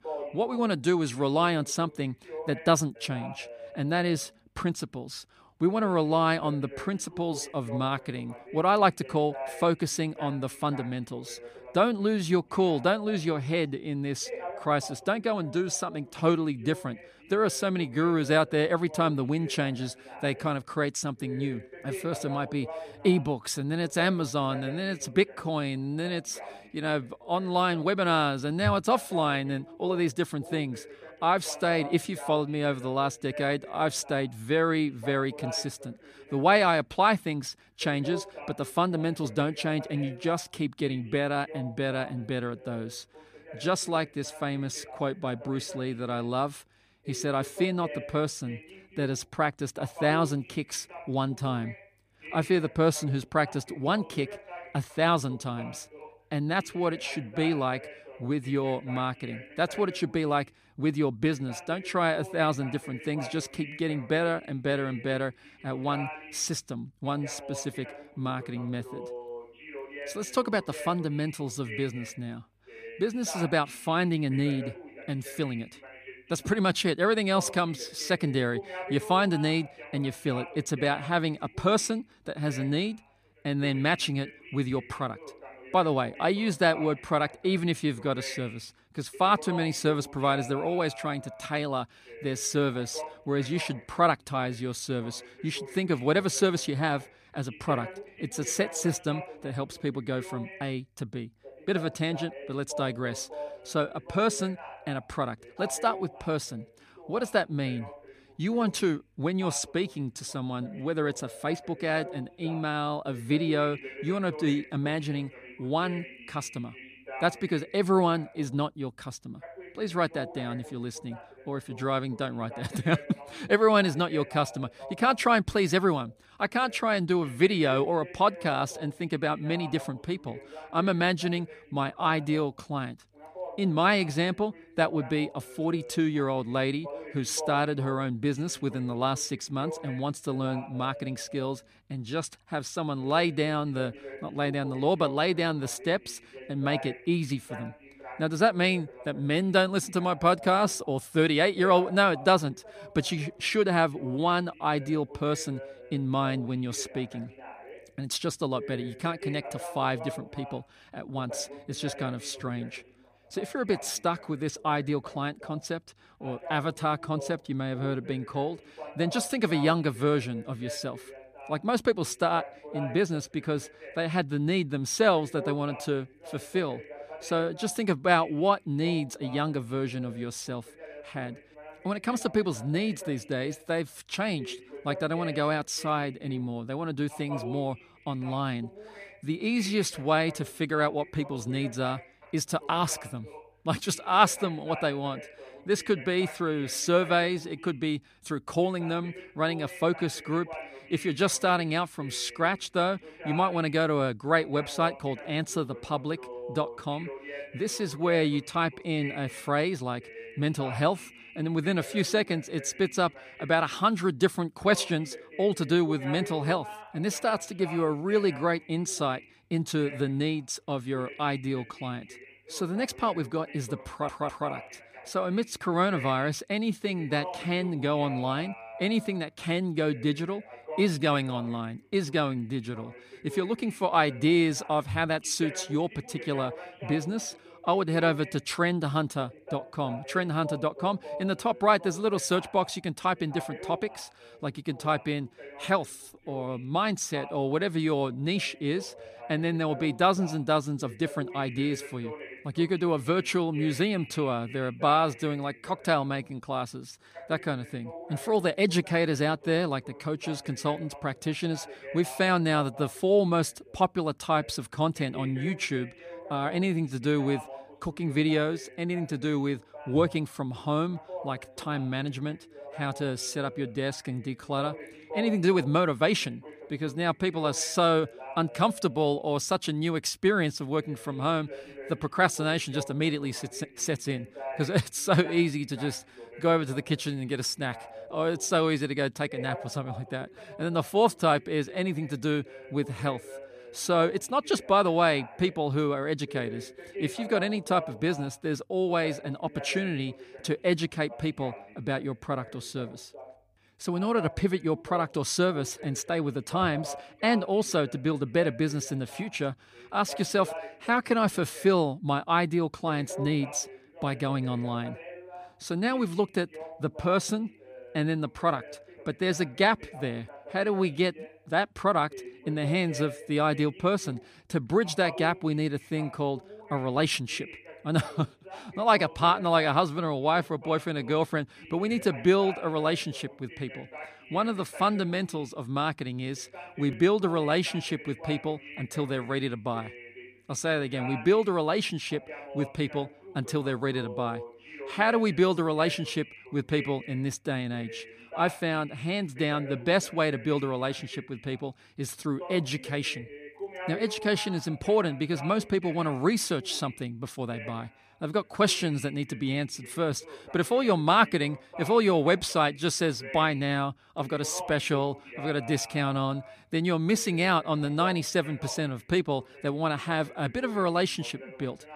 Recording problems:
voice in the background; noticeable; throughout; 15 dB below the speech
audio stuttering; at 3:44

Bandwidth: 15 kHz